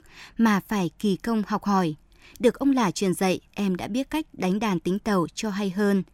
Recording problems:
none

